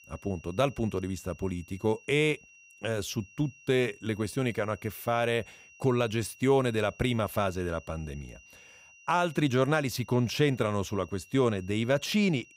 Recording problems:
high-pitched whine; faint; throughout; 2.5 kHz, 25 dB below the speech

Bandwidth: 15.5 kHz